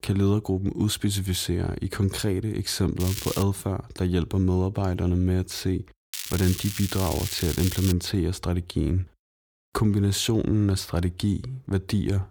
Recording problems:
crackling; loud; at 3 s and from 6 to 8 s; 7 dB below the speech

